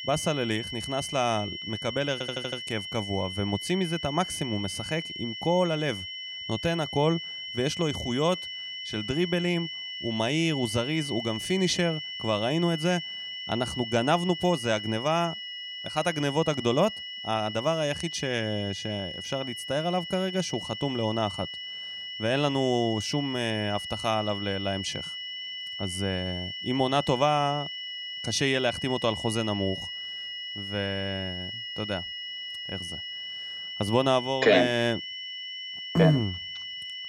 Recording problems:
high-pitched whine; loud; throughout; 3 kHz, 6 dB below the speech
audio stuttering; at 2 s

